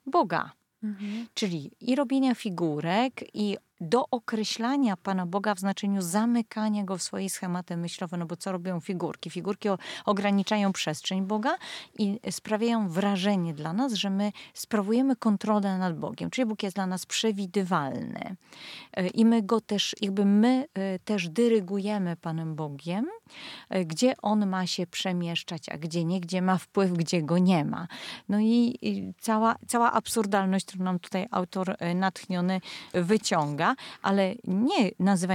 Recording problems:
abrupt cut into speech; at the end

